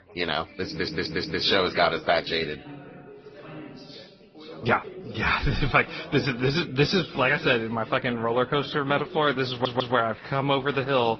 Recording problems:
high frequencies cut off; noticeable; nothing above 5.5 kHz
garbled, watery; slightly
background chatter; noticeable; throughout; 3 voices, 20 dB below the speech
uneven, jittery; strongly; from 0.5 to 10 s
audio stuttering; at 0.5 s and at 9.5 s

